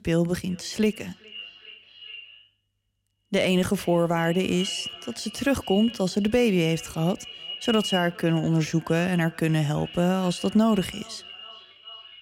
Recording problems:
echo of what is said; noticeable; throughout; 410 ms later, 15 dB below the speech

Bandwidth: 16 kHz